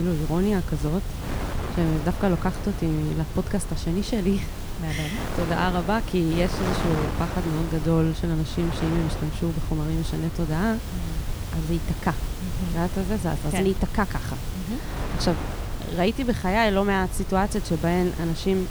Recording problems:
wind noise on the microphone; heavy; 9 dB below the speech
hiss; noticeable; throughout; 15 dB below the speech
low rumble; faint; throughout; 25 dB below the speech
abrupt cut into speech; at the start

